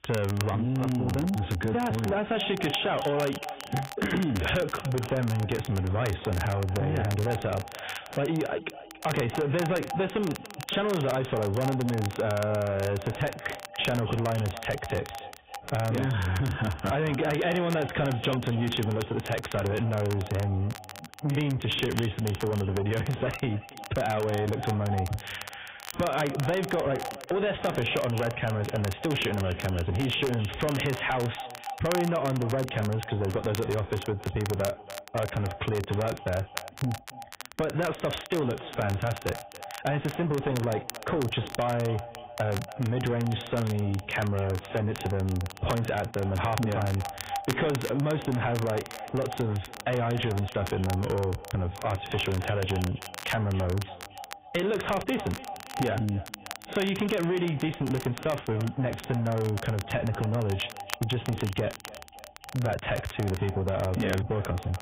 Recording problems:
garbled, watery; badly; nothing above 3.5 kHz
squashed, flat; heavily
echo of what is said; noticeable; throughout; 280 ms later, 15 dB below the speech
distortion; slight; 10 dB below the speech
high frequencies cut off; slight
crackle, like an old record; noticeable; 15 dB below the speech

